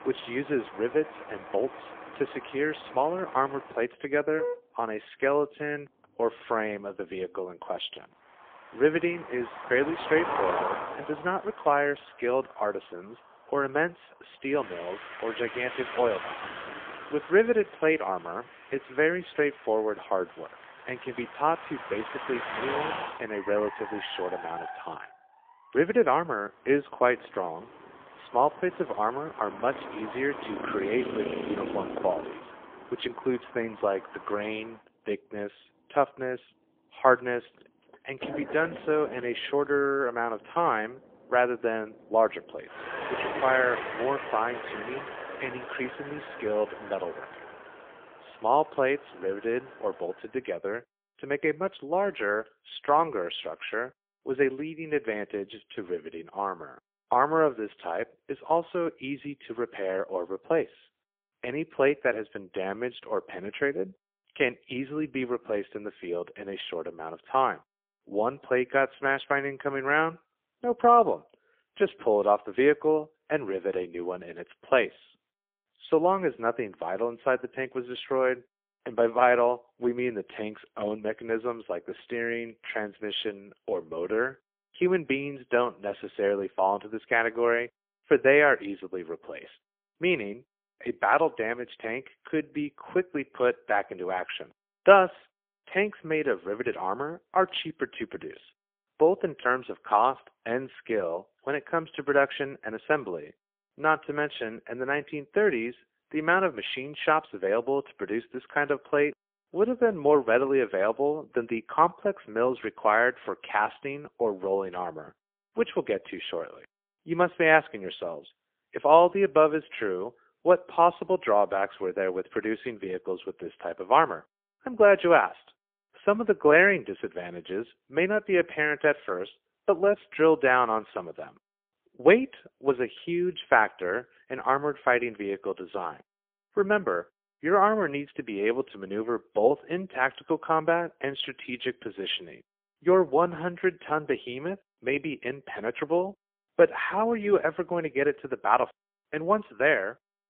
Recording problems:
phone-call audio; poor line; nothing above 3.5 kHz
traffic noise; noticeable; until 50 s; 10 dB below the speech

